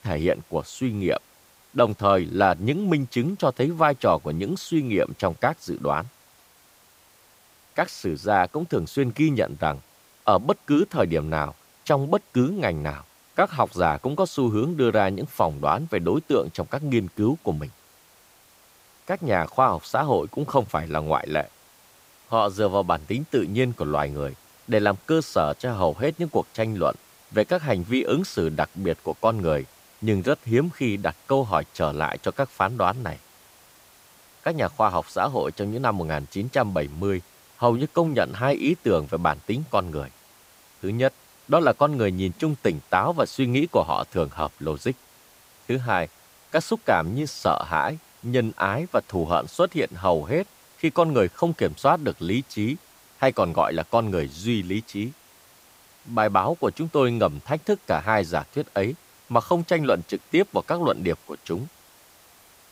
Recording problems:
hiss; faint; throughout; 30 dB below the speech

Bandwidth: 15.5 kHz